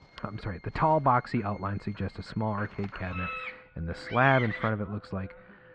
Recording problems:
muffled; very; fading above 2.5 kHz
animal sounds; loud; throughout; 9 dB below the speech
background music; faint; throughout; 25 dB below the speech

